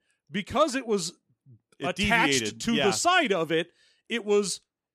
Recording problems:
none

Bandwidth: 14.5 kHz